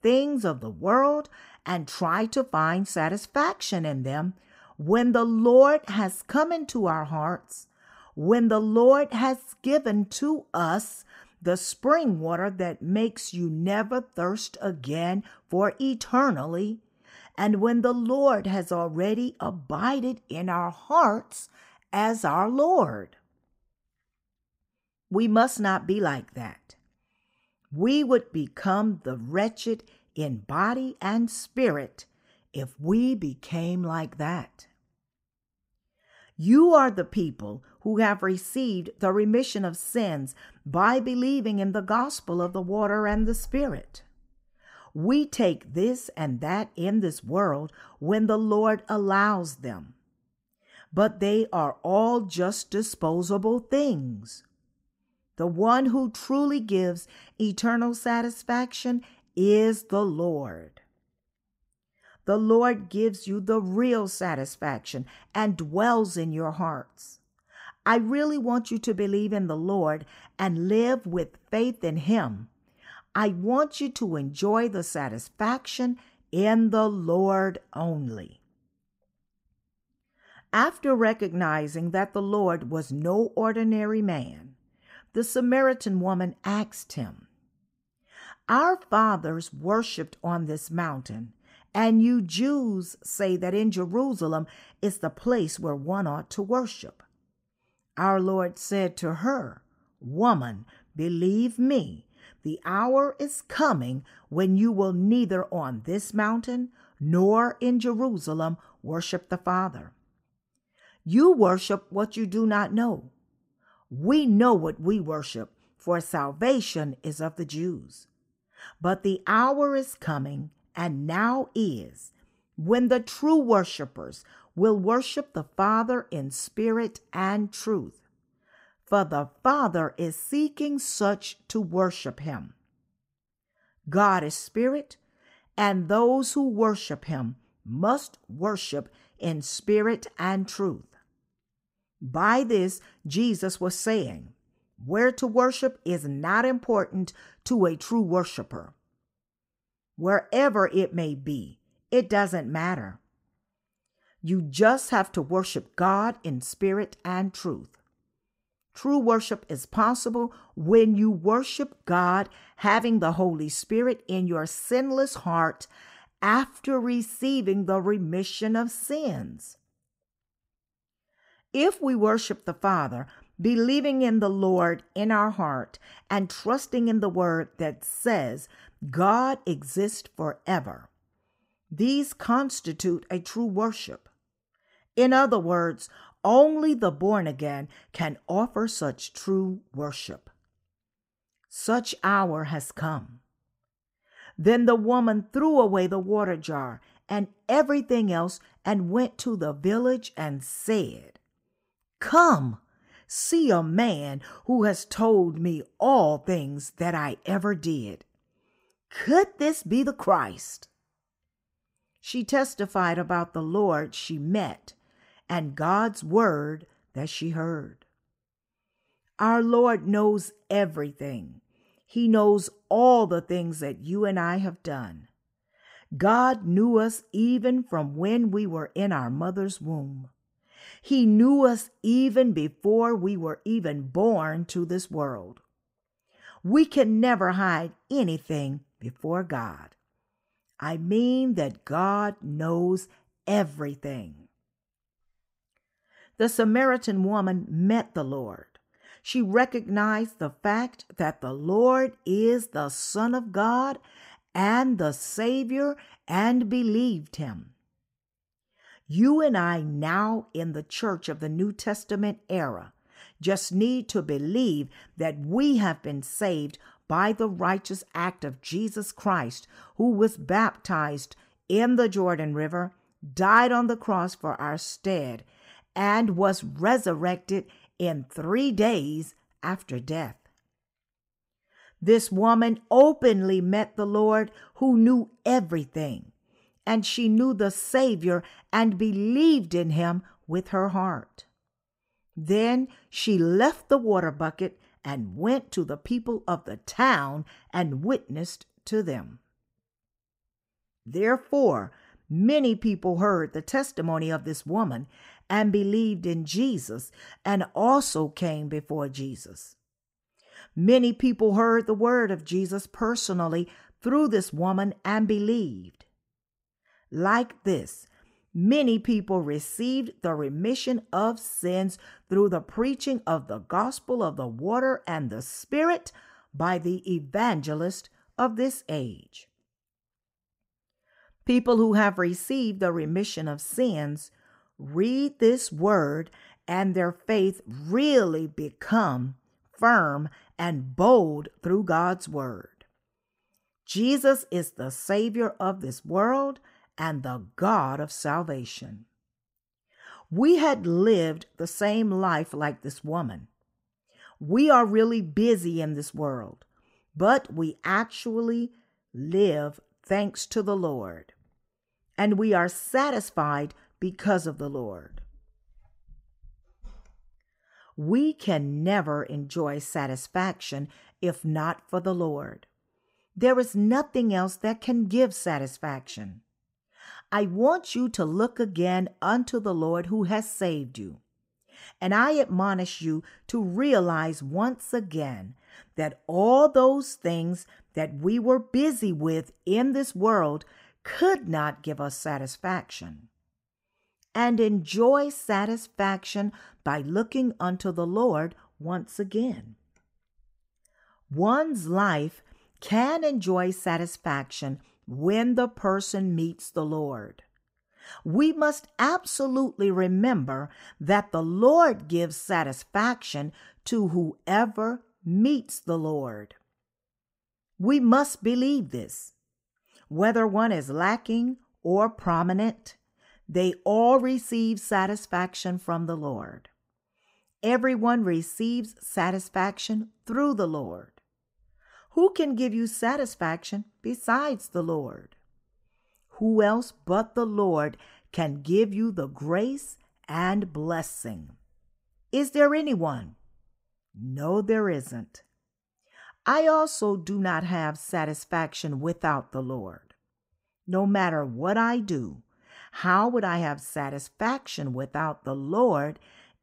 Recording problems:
none

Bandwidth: 15.5 kHz